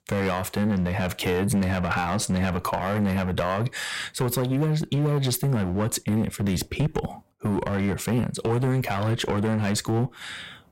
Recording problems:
distortion; heavy; 13% of the sound clipped

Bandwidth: 16 kHz